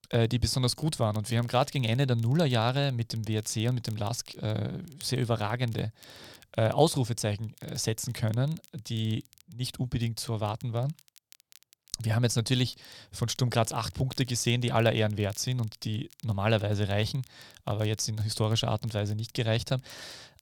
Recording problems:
crackle, like an old record; faint; 25 dB below the speech

